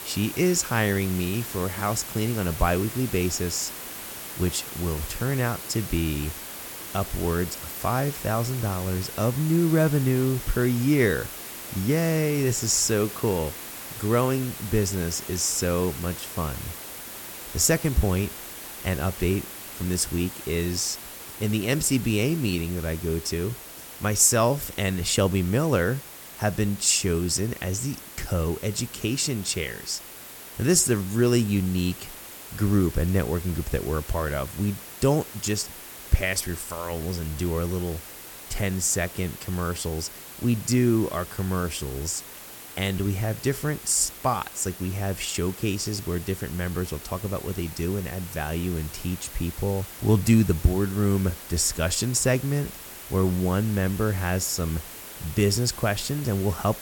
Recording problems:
hiss; noticeable; throughout; 10 dB below the speech

